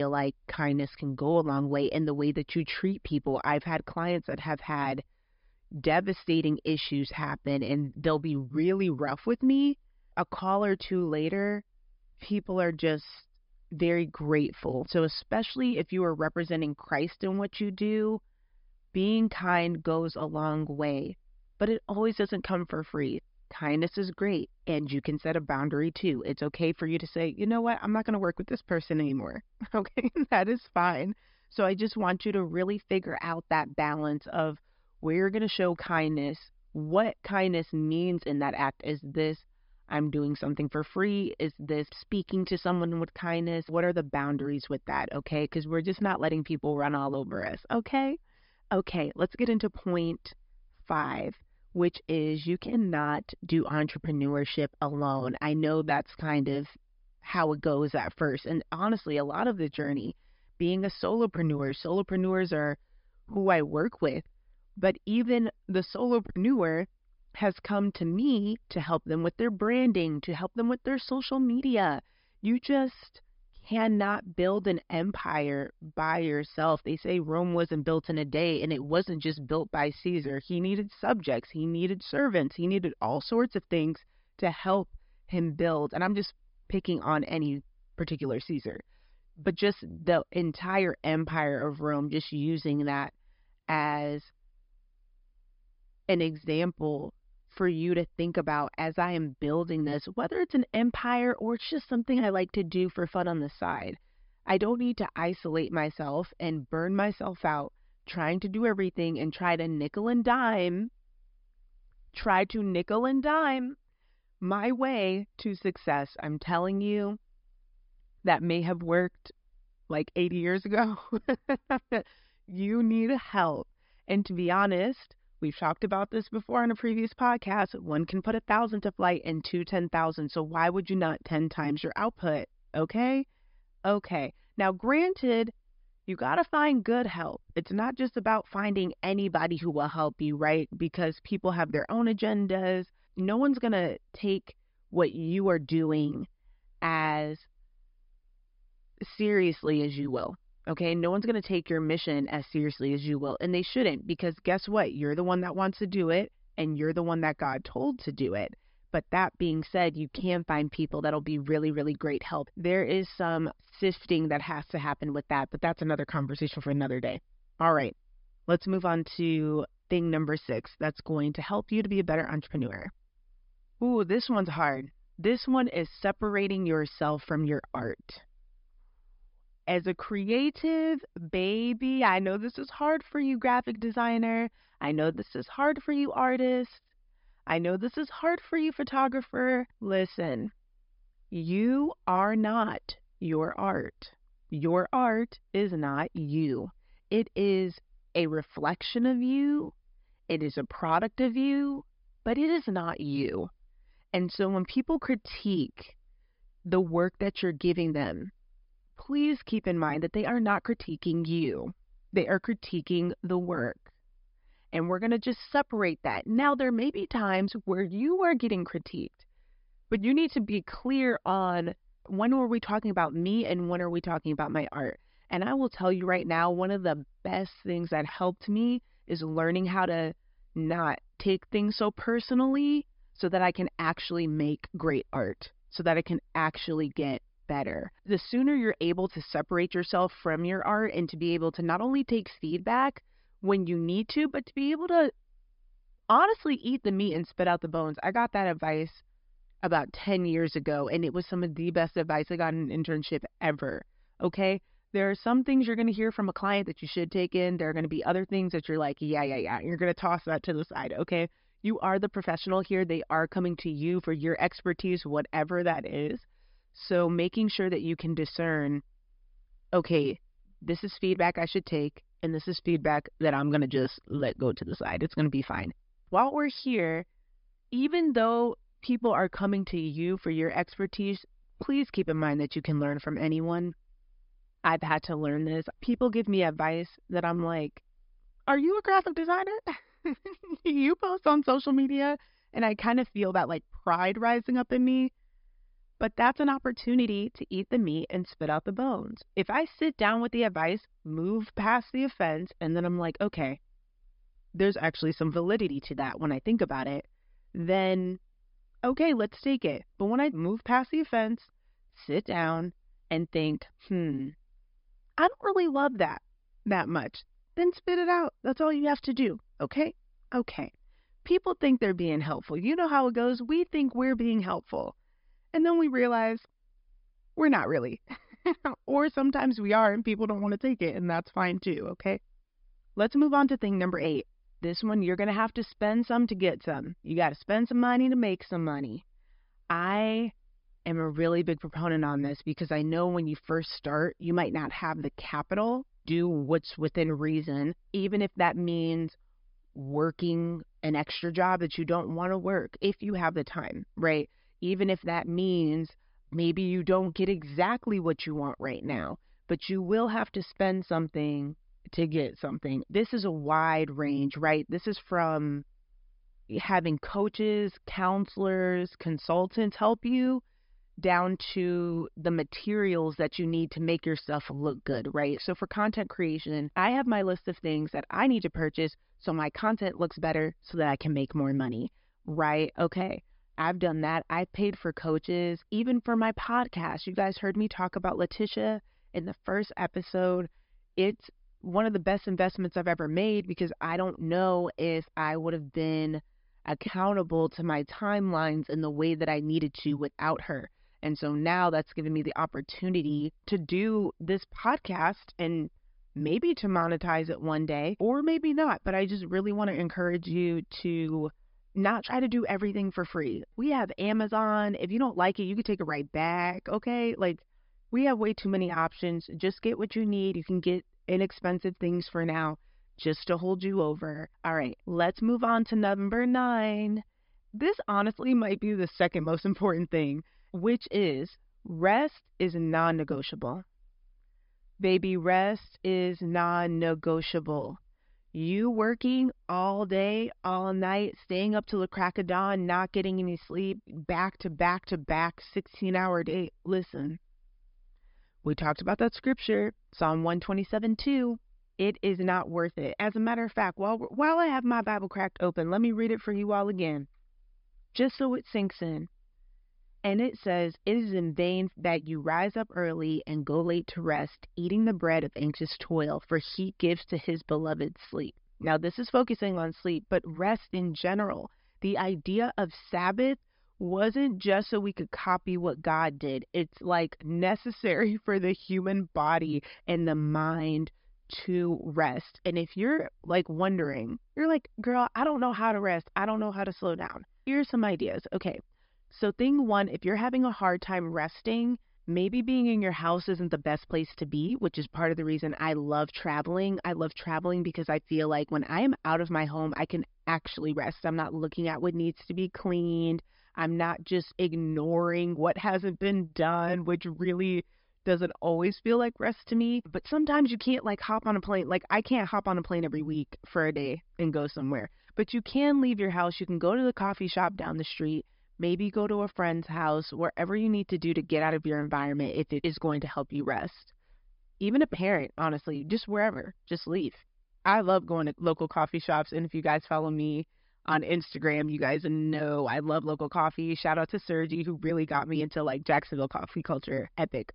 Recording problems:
high frequencies cut off; noticeable; nothing above 5.5 kHz
abrupt cut into speech; at the start

